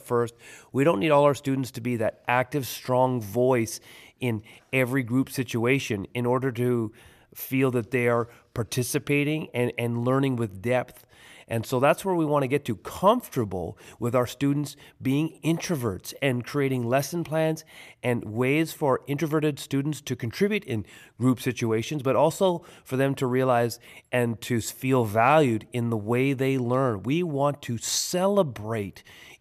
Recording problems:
none

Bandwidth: 14.5 kHz